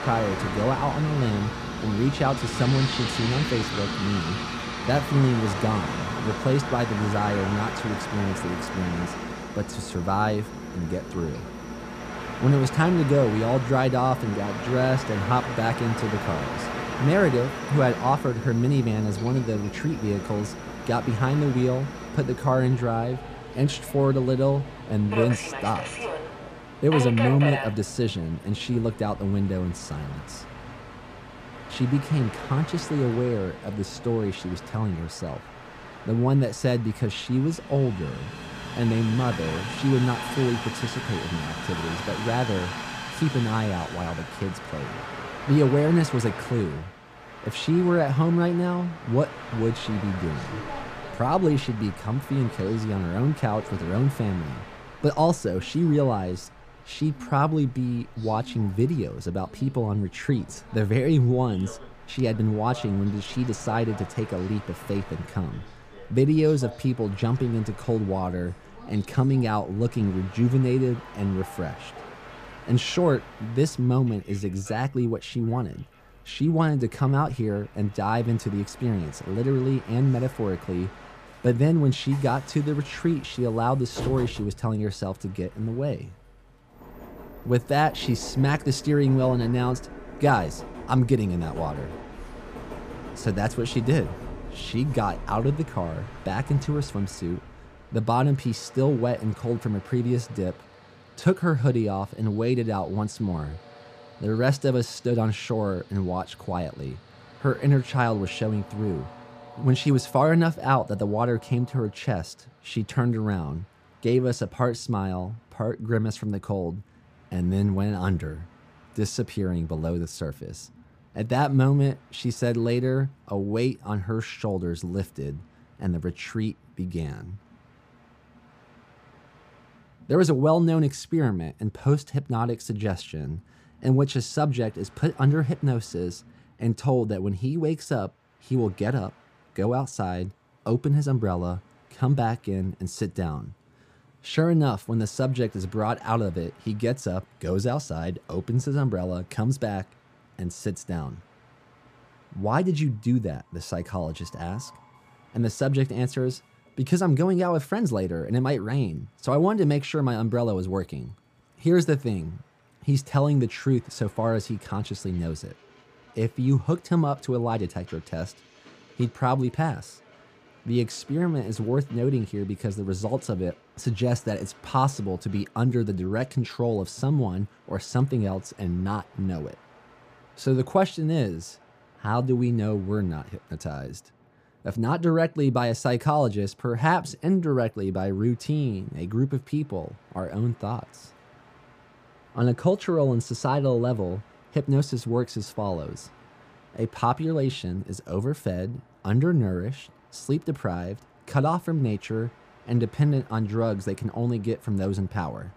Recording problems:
train or aircraft noise; loud; throughout; 10 dB below the speech

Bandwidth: 15 kHz